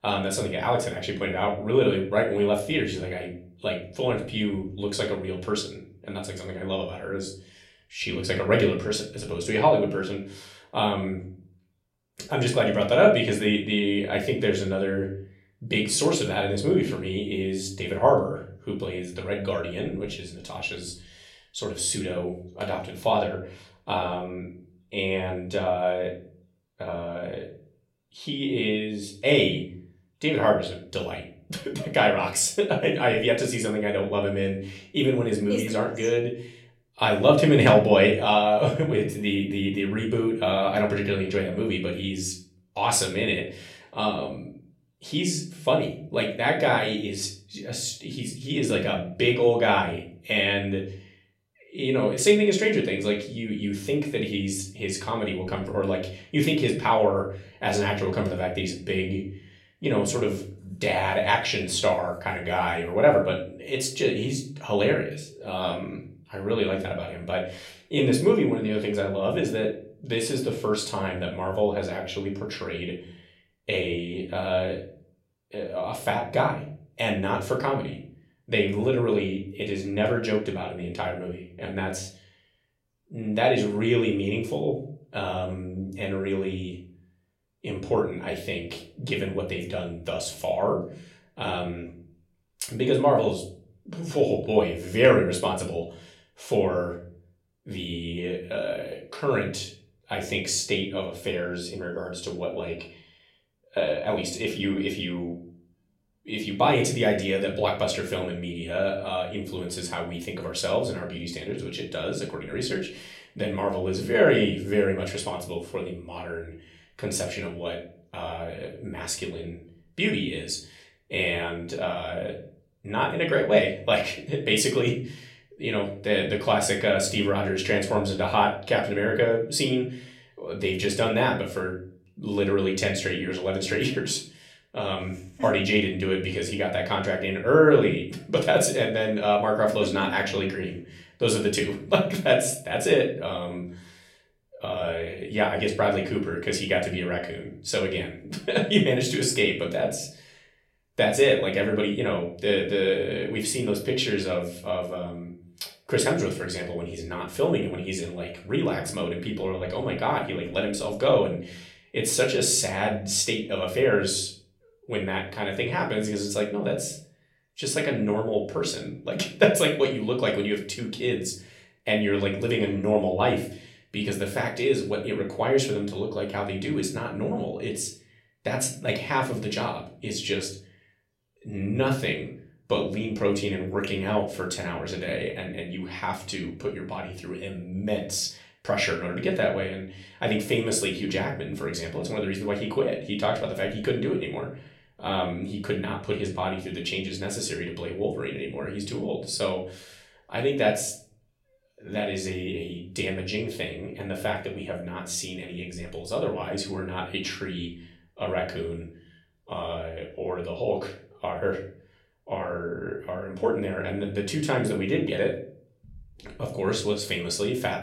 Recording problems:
room echo; slight; dies away in 0.4 s
off-mic speech; somewhat distant

